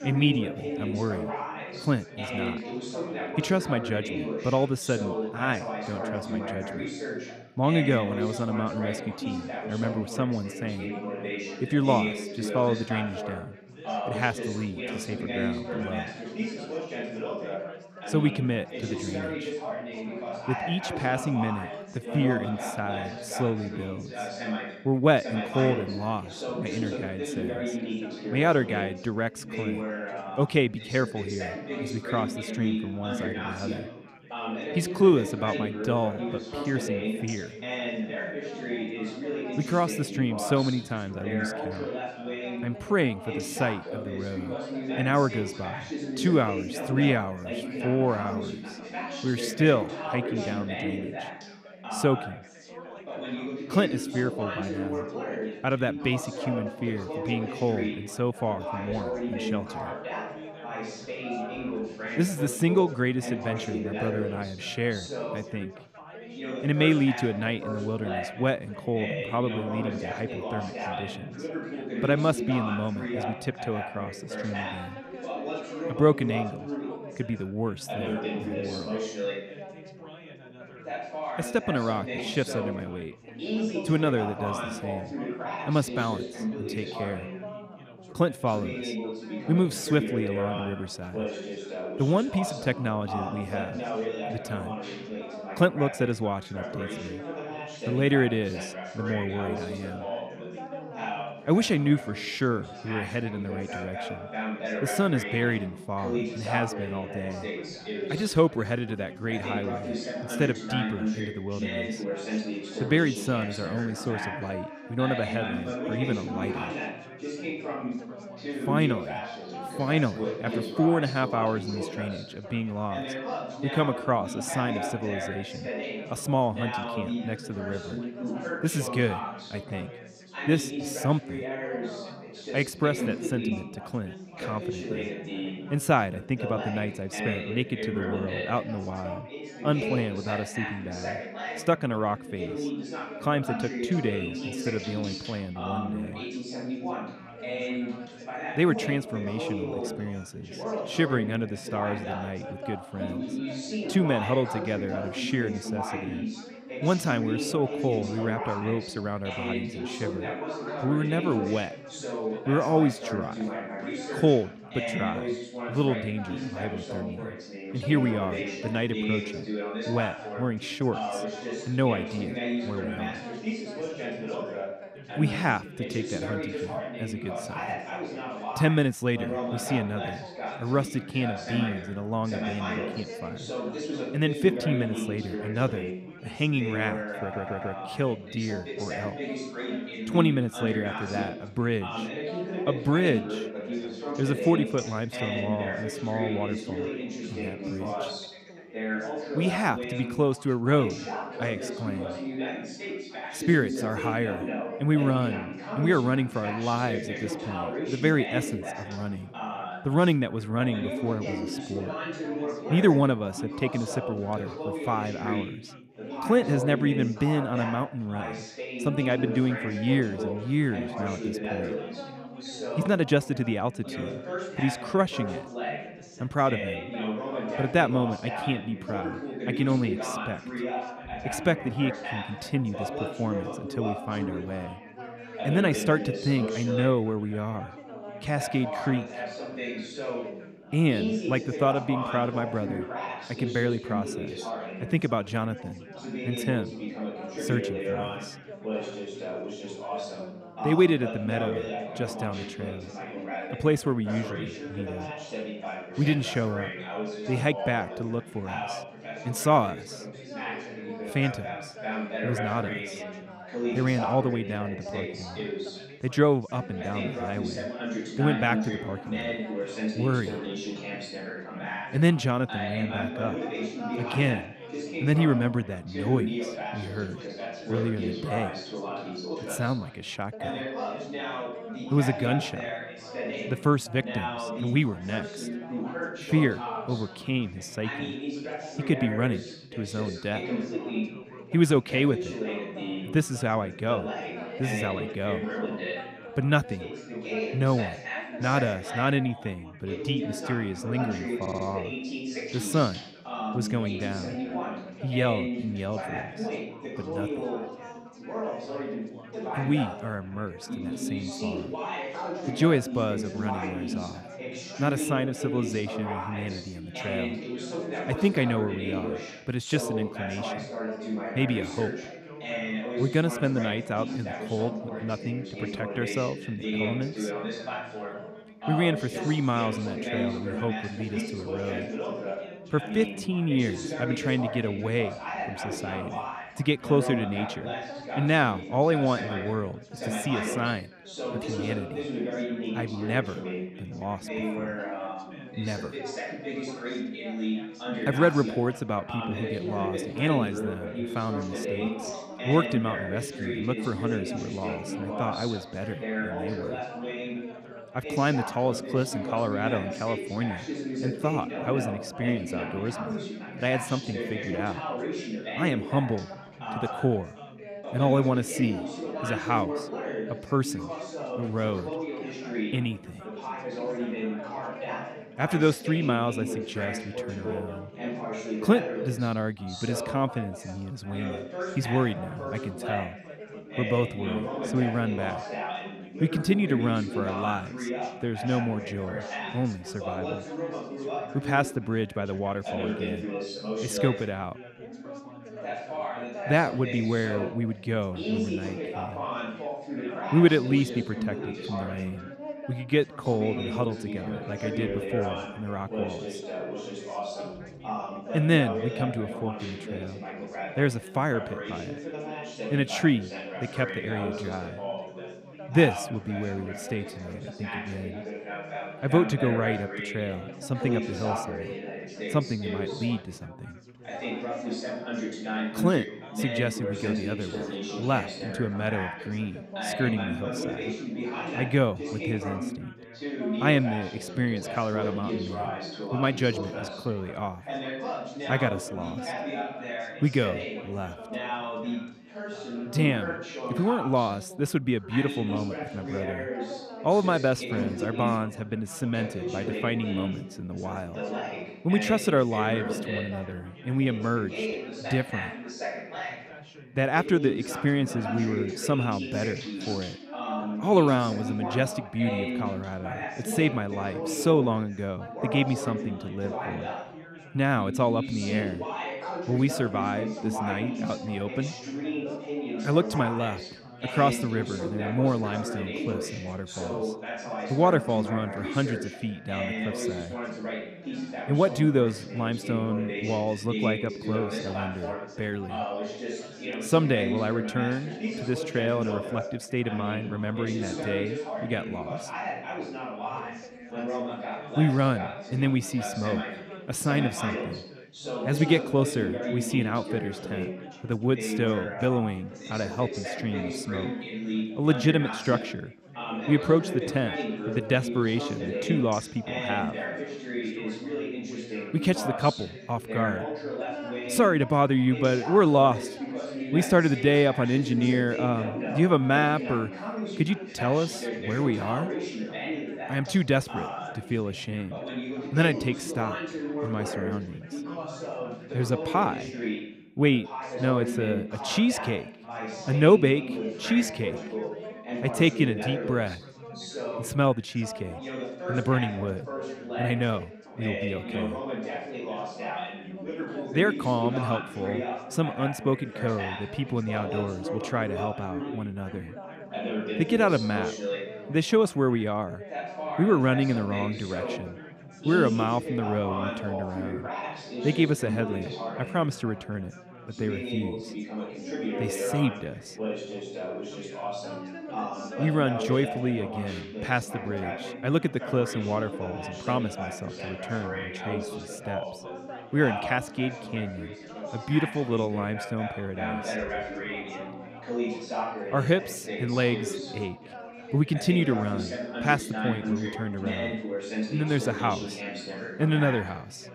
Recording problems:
background chatter; loud; throughout; 4 voices, 6 dB below the speech
dog barking; faint; at 1:01; peak 10 dB below the speech
audio stuttering; at 3:07 and at 5:01

